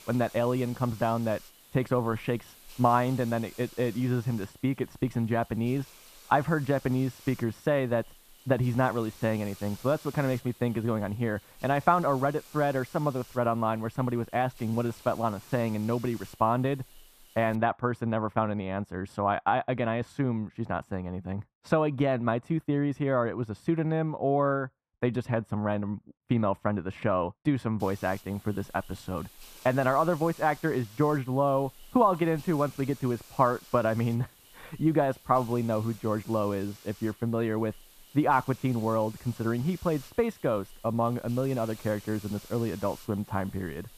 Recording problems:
muffled; slightly; fading above 2 kHz
hiss; faint; until 18 s and from 28 s on; 20 dB below the speech

